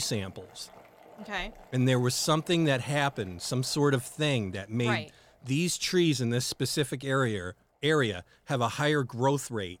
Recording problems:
household noises; faint; throughout; 25 dB below the speech
abrupt cut into speech; at the start

